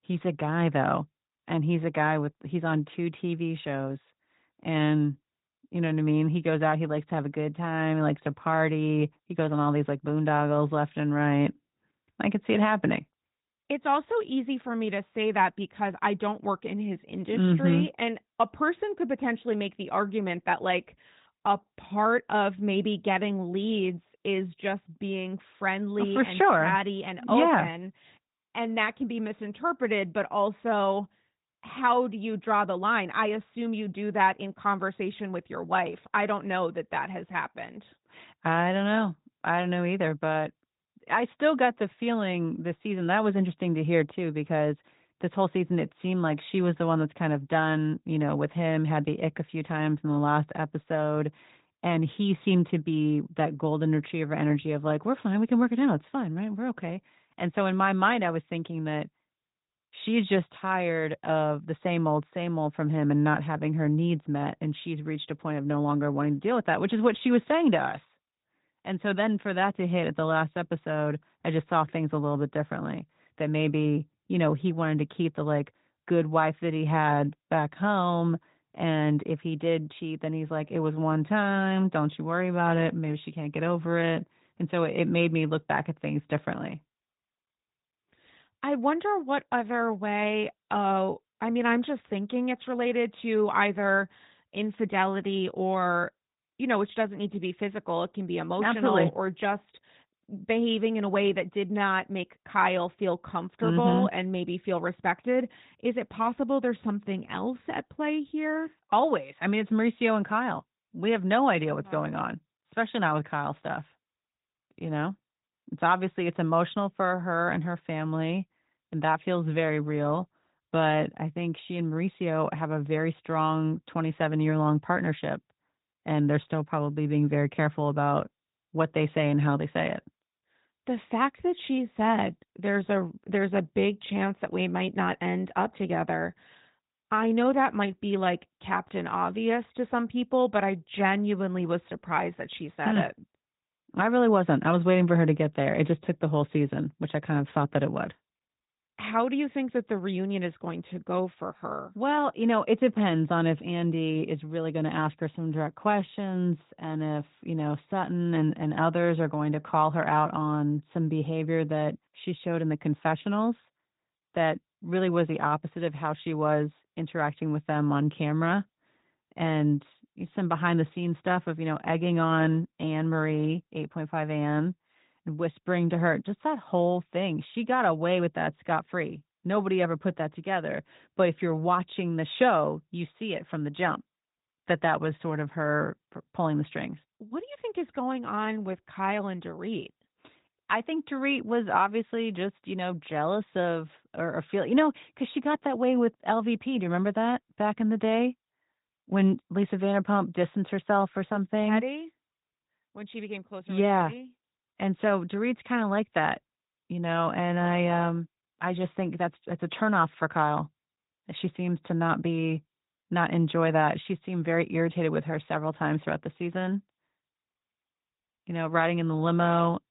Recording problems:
high frequencies cut off; severe; nothing above 4 kHz
garbled, watery; slightly

